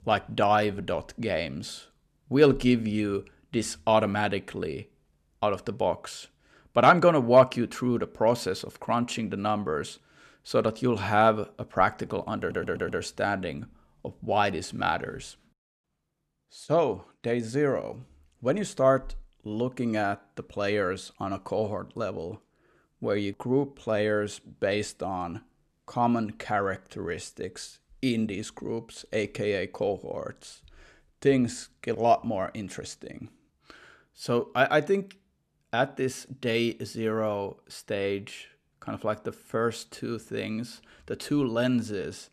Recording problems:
audio stuttering; at 12 s

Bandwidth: 13.5 kHz